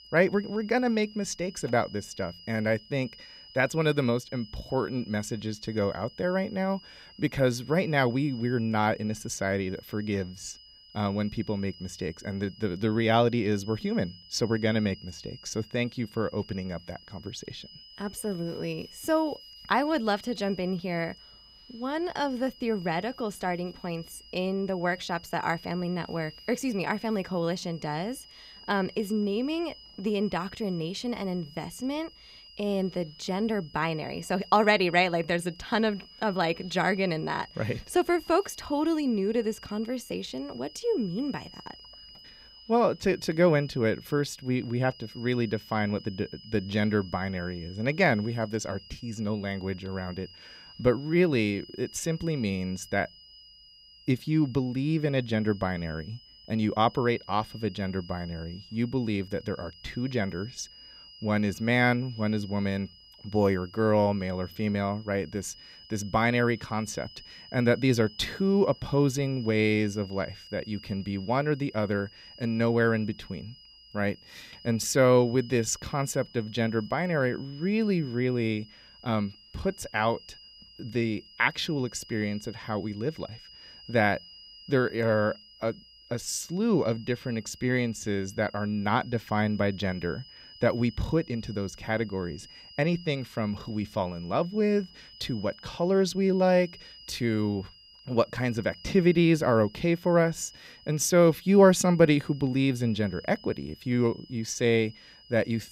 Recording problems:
high-pitched whine; faint; throughout; 5 kHz, 20 dB below the speech

